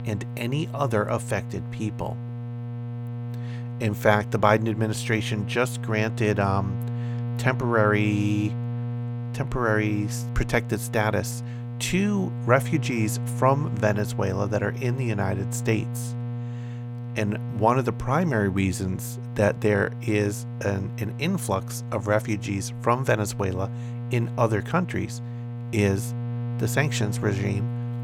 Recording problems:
electrical hum; noticeable; throughout; 60 Hz, 15 dB below the speech

